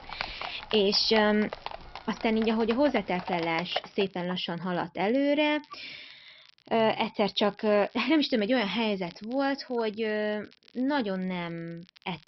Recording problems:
high frequencies cut off; noticeable; nothing above 5.5 kHz
animal sounds; noticeable; until 4 s; 10 dB below the speech
crackle, like an old record; faint; 30 dB below the speech

